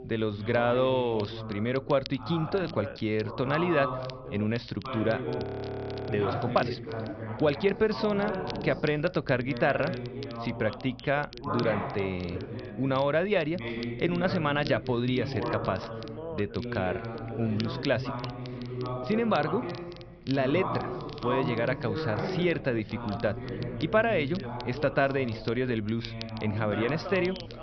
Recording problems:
high frequencies cut off; noticeable; nothing above 5.5 kHz
background chatter; loud; throughout; 2 voices, 7 dB below the speech
crackle, like an old record; noticeable; 20 dB below the speech
low rumble; faint; throughout; 25 dB below the speech
audio freezing; at 5.5 s for 0.5 s

